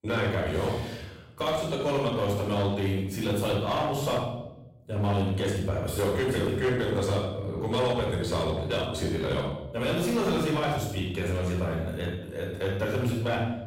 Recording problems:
off-mic speech; far
room echo; noticeable; dies away in 0.8 s
distortion; slight; 12% of the sound clipped

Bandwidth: 16 kHz